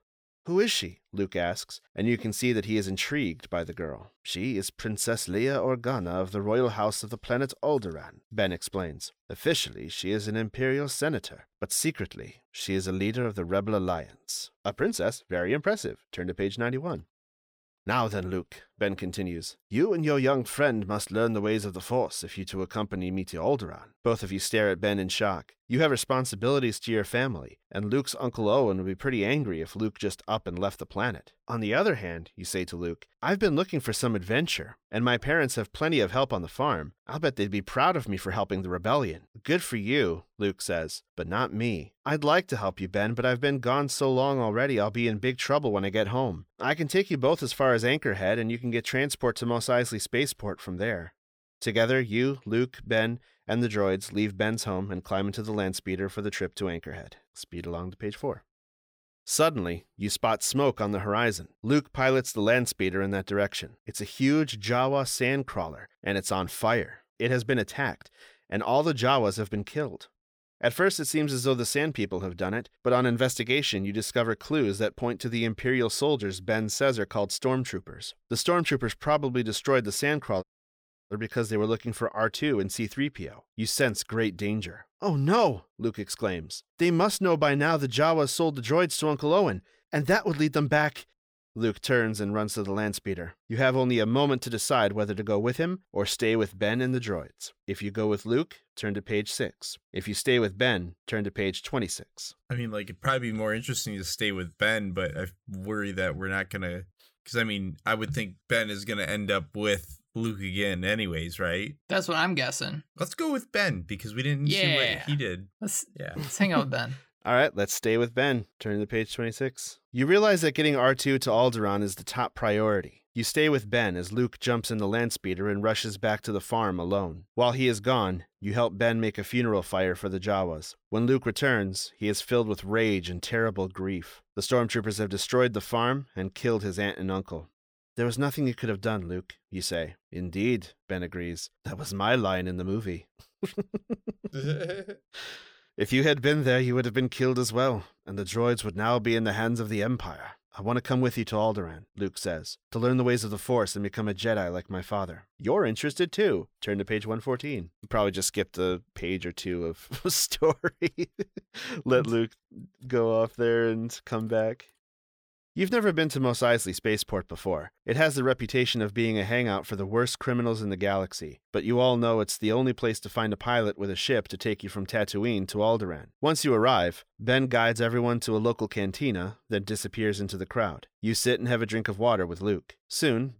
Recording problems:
audio cutting out; at 1:20 for 0.5 s

